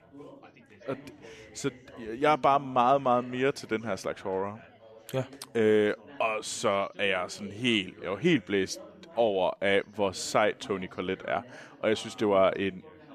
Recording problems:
background chatter; faint; throughout; 3 voices, 20 dB below the speech

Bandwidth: 14.5 kHz